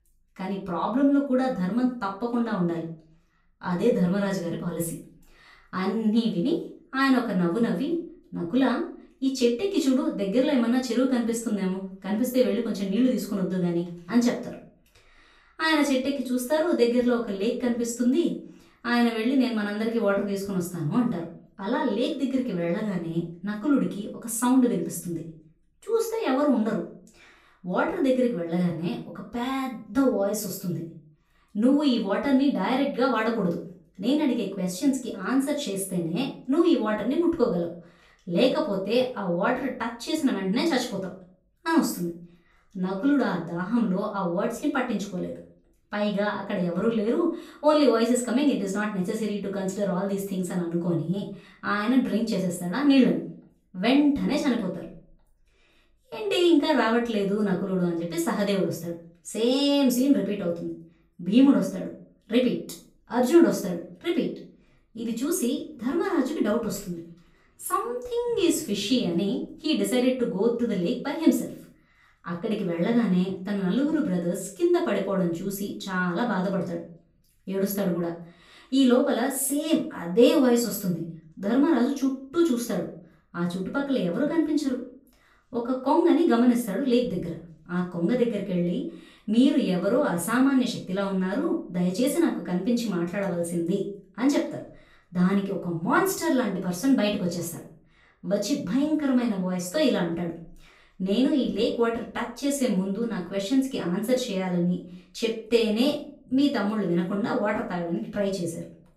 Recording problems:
off-mic speech; far
room echo; slight; dies away in 0.4 s

